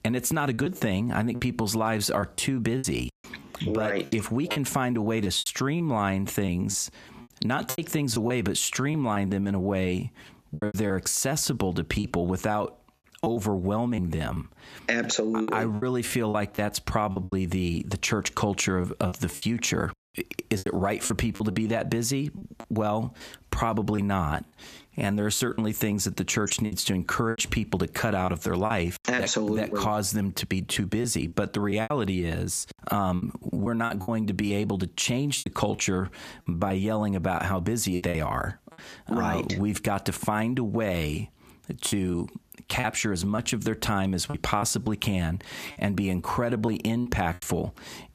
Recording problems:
squashed, flat; somewhat
choppy; very; 7% of the speech affected

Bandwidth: 14.5 kHz